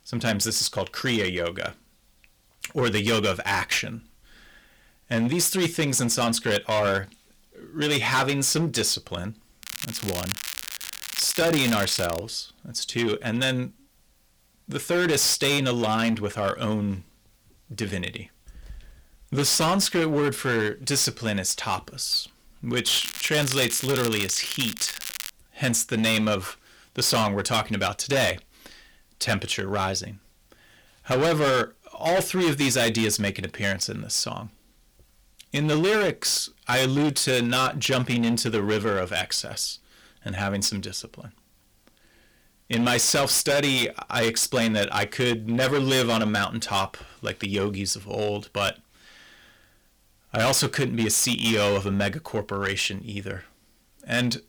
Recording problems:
distortion; heavy; 10% of the sound clipped
crackling; loud; from 9.5 to 12 s and from 23 to 25 s; 8 dB below the speech

